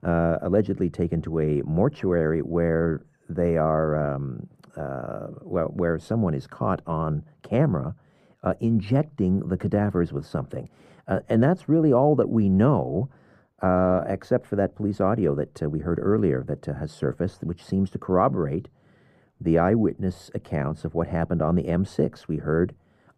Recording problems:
muffled; very; fading above 2 kHz

